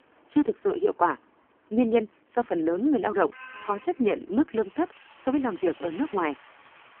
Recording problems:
phone-call audio; poor line
traffic noise; faint; throughout; 20 dB below the speech

